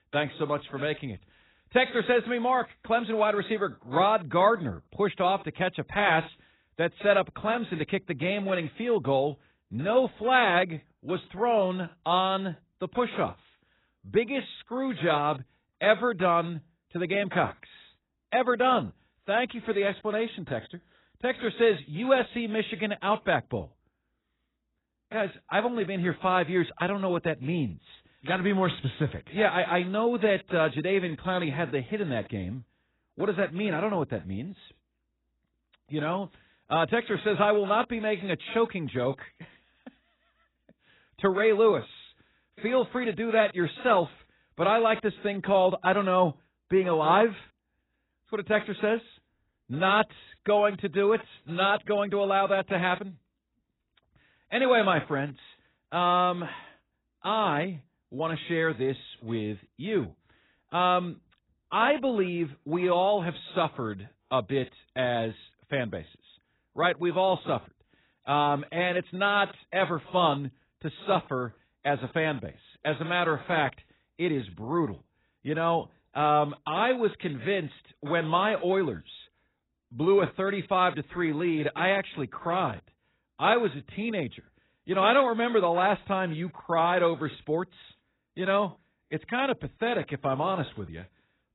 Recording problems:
garbled, watery; badly; nothing above 4 kHz

